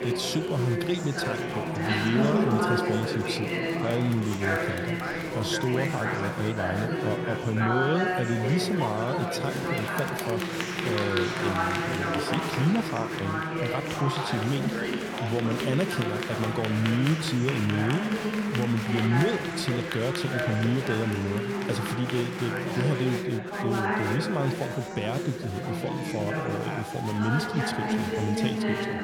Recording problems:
chatter from many people; very loud; throughout; as loud as the speech

